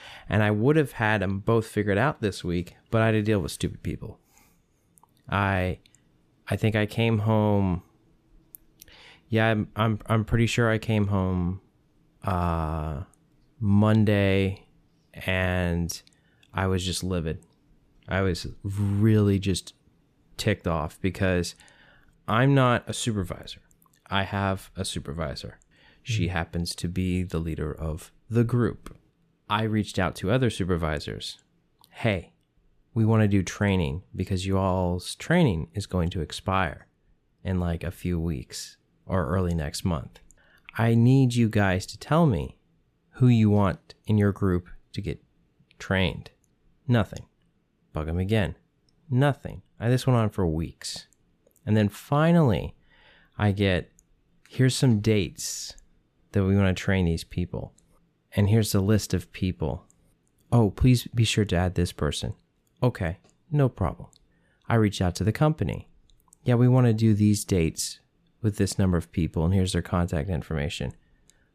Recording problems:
none

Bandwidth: 14.5 kHz